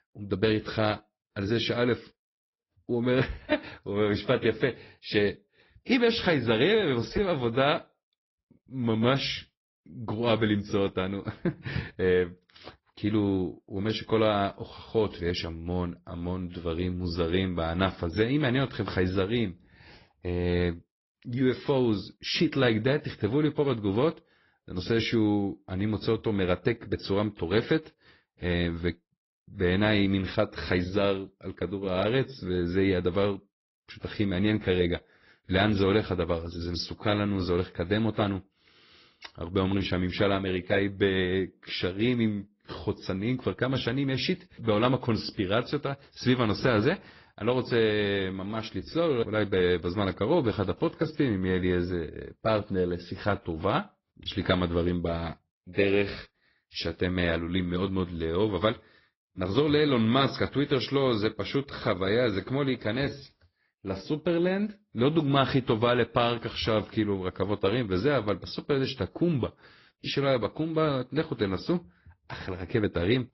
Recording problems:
high frequencies cut off; noticeable; nothing above 5.5 kHz
garbled, watery; slightly

